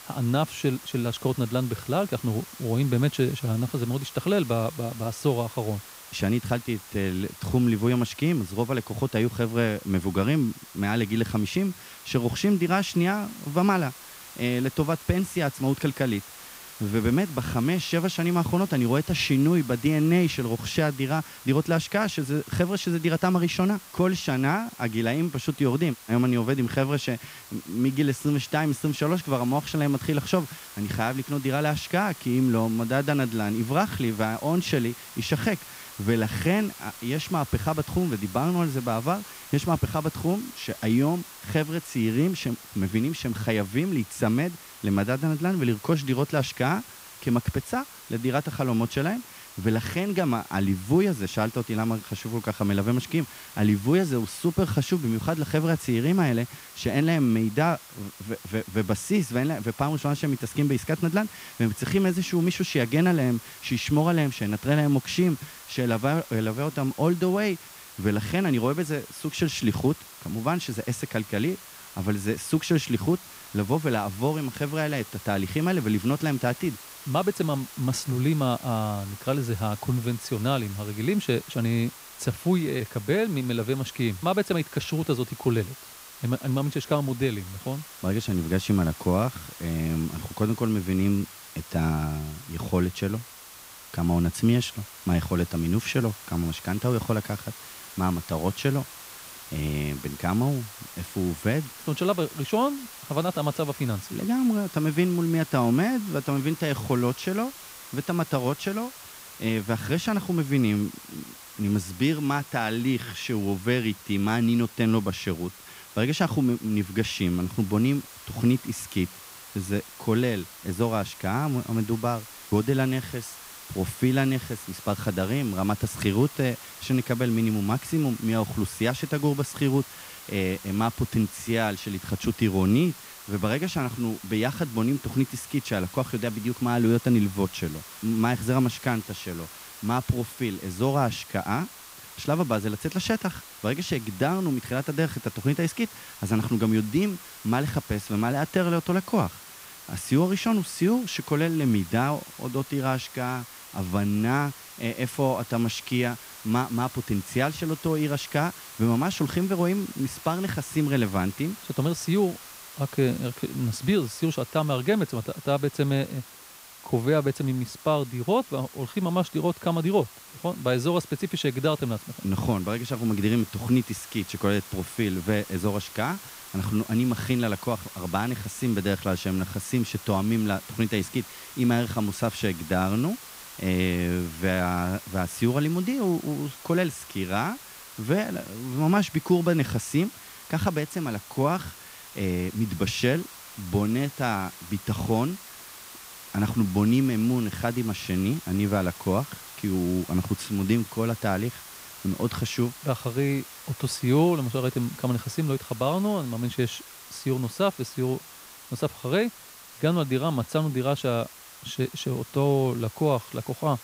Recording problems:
hiss; noticeable; throughout; 15 dB below the speech

